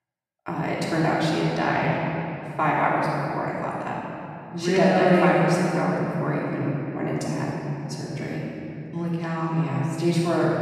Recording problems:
room echo; strong; dies away in 2.7 s
off-mic speech; far

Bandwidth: 14.5 kHz